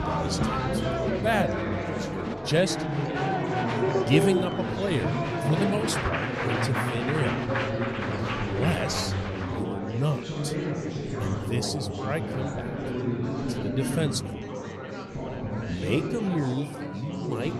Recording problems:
chatter from many people; very loud; throughout; 1 dB above the speech

